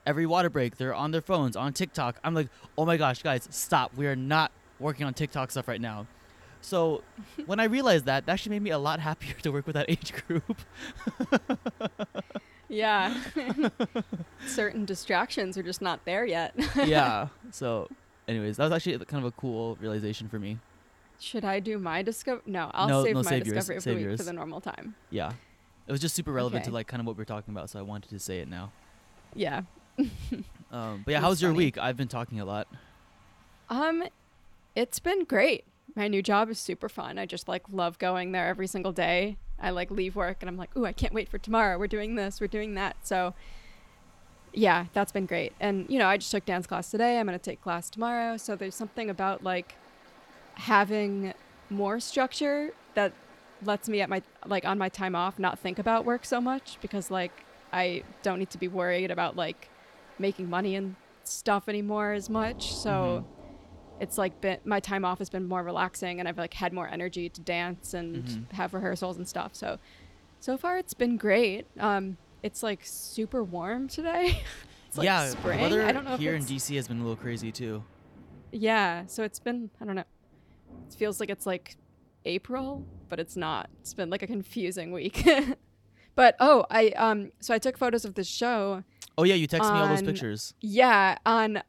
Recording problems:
rain or running water; faint; throughout; 25 dB below the speech

